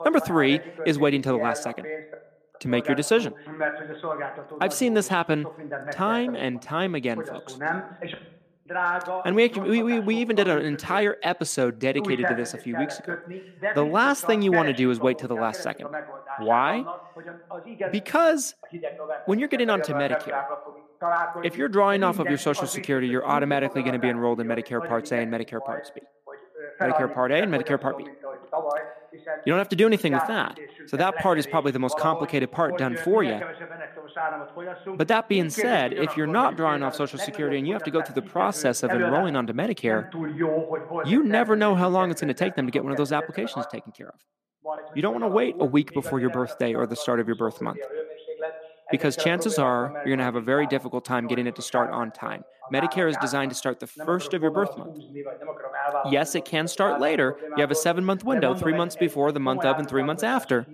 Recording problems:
voice in the background; loud; throughout; 8 dB below the speech

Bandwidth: 14.5 kHz